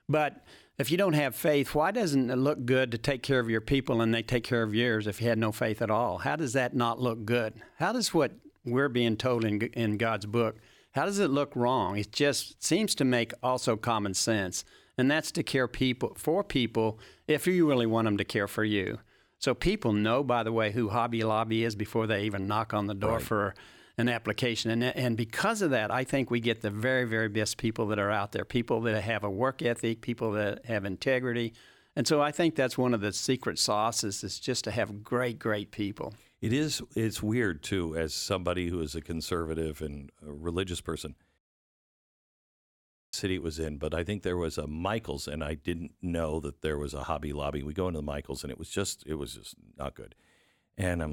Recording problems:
audio cutting out; at 41 s for 2 s
abrupt cut into speech; at the end

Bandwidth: 18 kHz